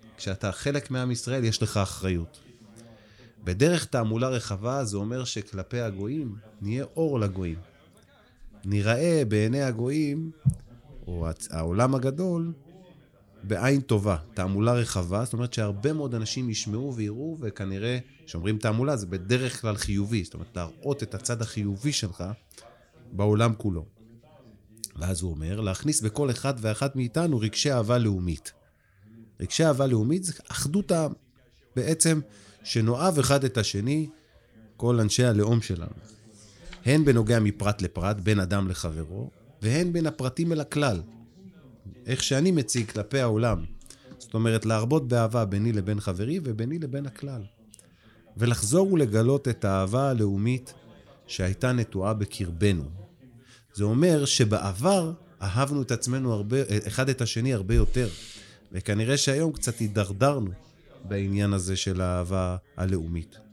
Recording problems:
background chatter; faint; throughout; 3 voices, 30 dB below the speech

